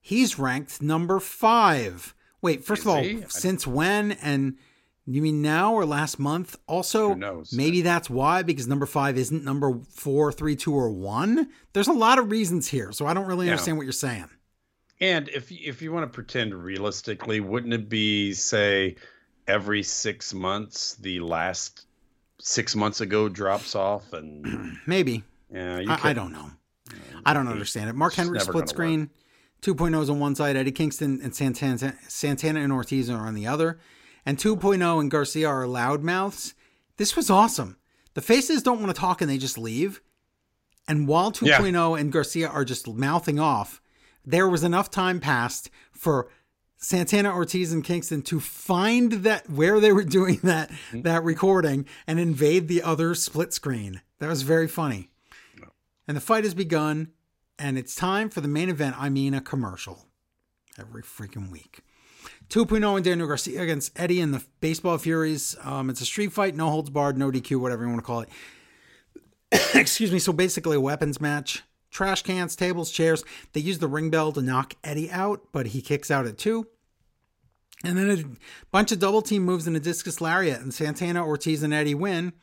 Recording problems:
none

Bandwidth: 16 kHz